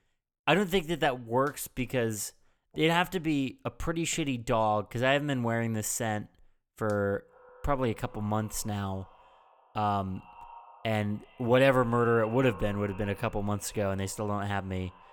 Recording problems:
echo of what is said; faint; from 7 s on; 120 ms later, 25 dB below the speech

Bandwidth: 18.5 kHz